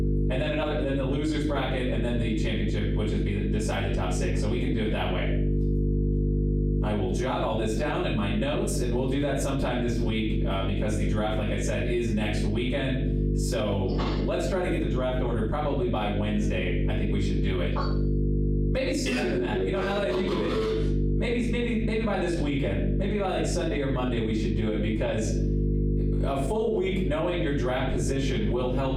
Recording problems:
off-mic speech; far
room echo; noticeable; dies away in 0.5 s
squashed, flat; somewhat
electrical hum; loud; throughout; 50 Hz, 8 dB below the speech

